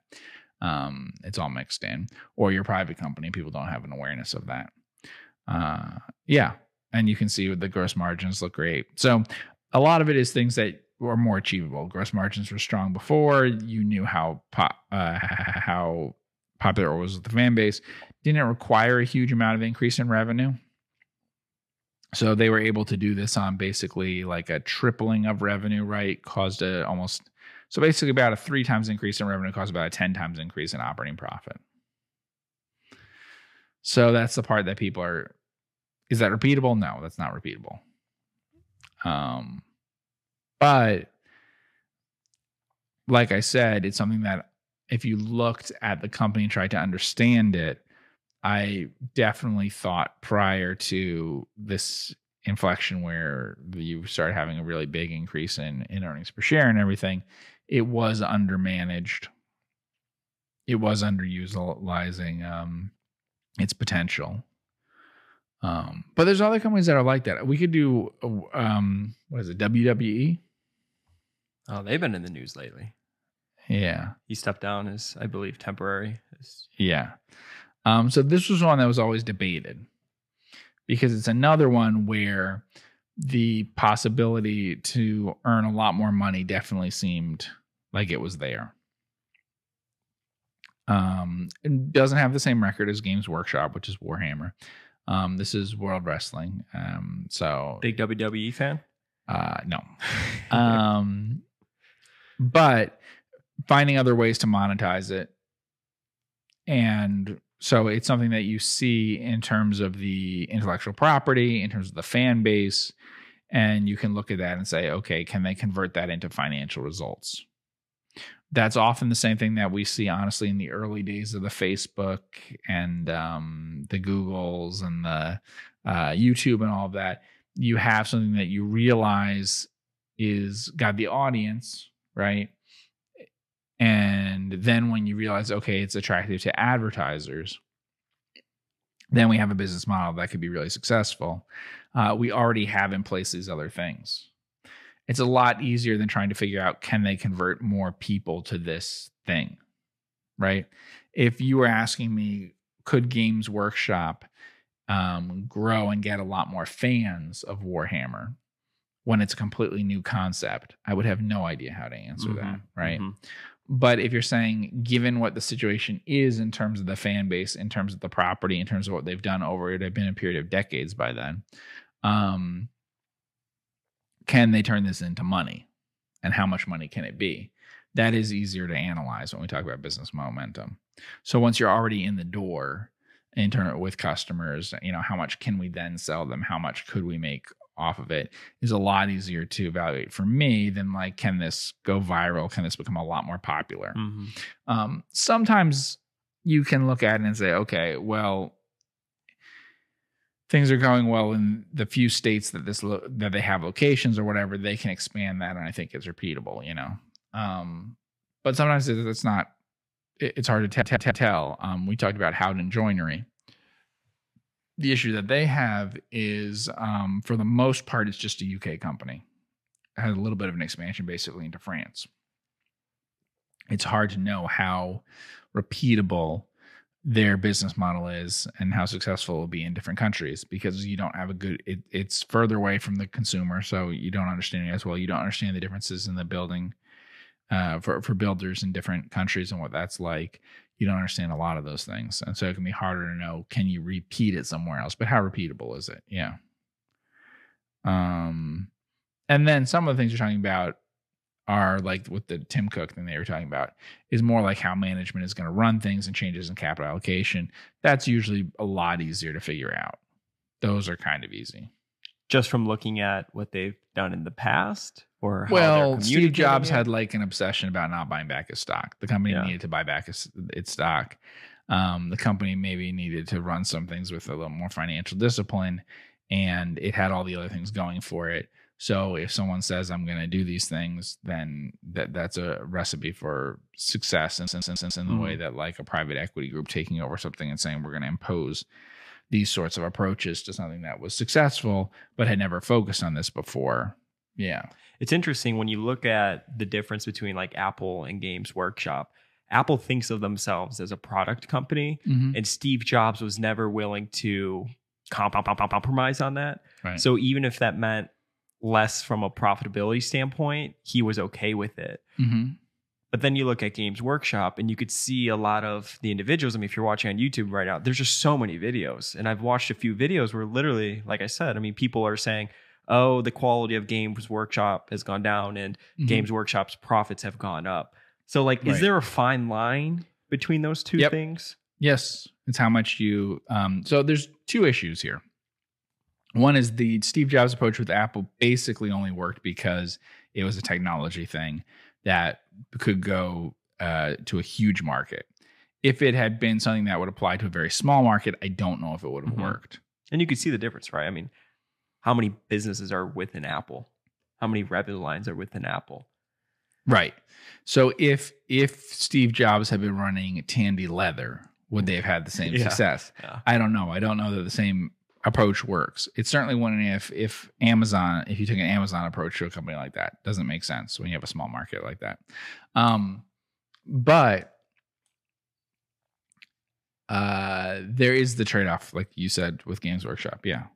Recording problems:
audio stuttering; 4 times, first at 15 s

